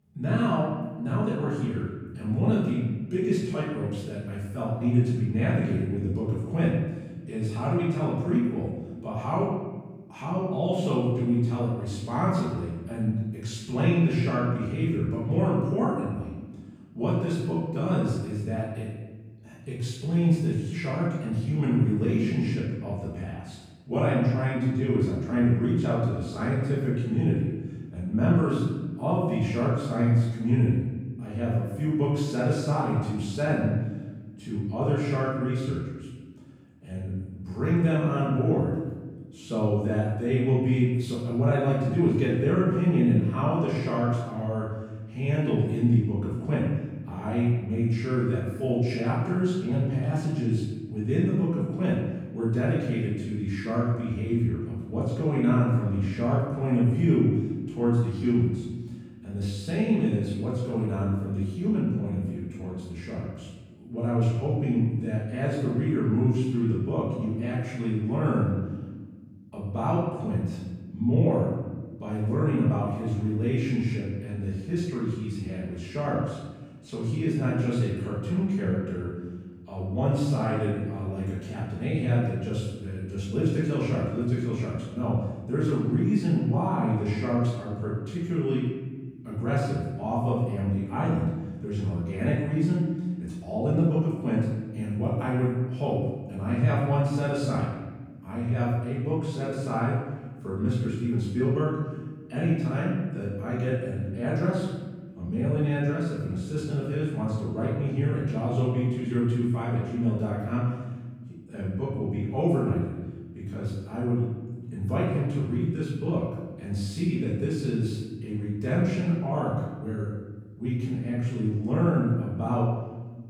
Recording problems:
off-mic speech; far
room echo; noticeable; dies away in 1.1 s

